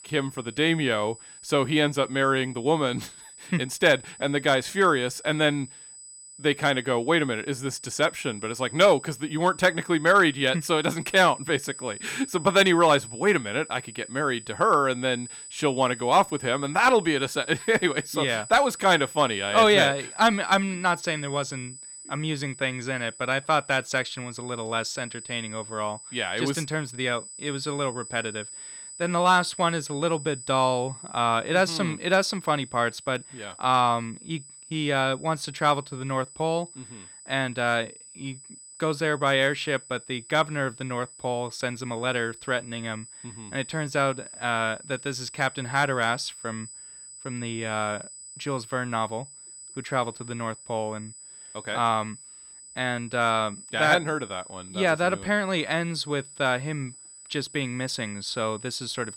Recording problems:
high-pitched whine; noticeable; throughout; 8 kHz, 15 dB below the speech

